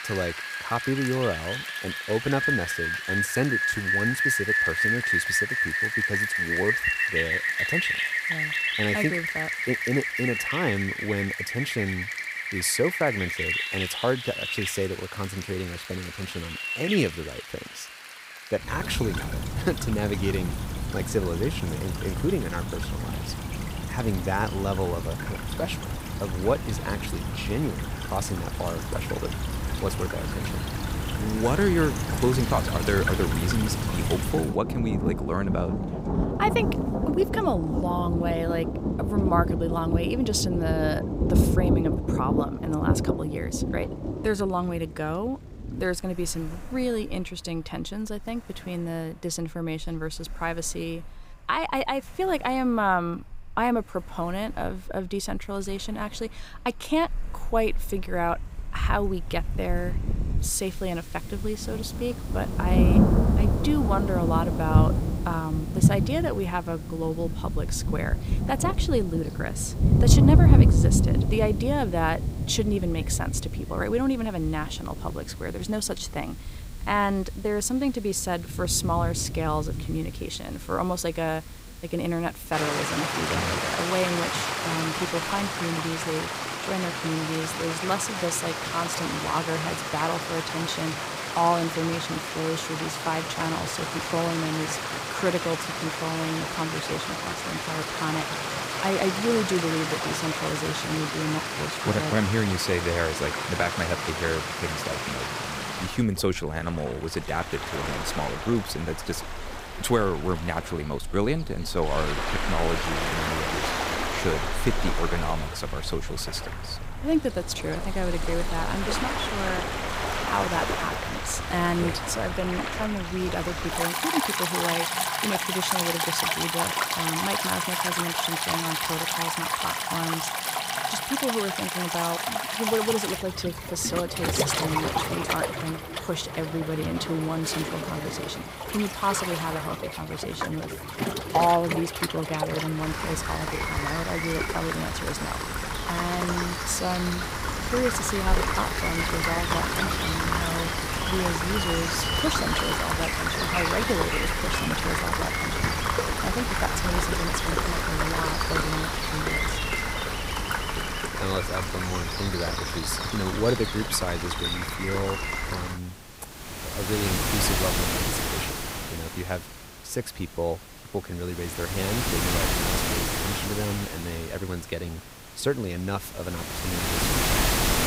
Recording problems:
rain or running water; very loud; throughout; 2 dB above the speech

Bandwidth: 15.5 kHz